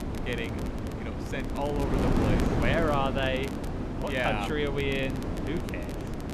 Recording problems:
wind noise on the microphone; heavy; 5 dB below the speech
crackle, like an old record; noticeable; 20 dB below the speech

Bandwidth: 13.5 kHz